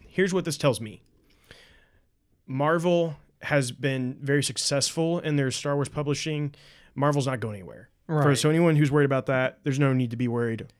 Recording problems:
none

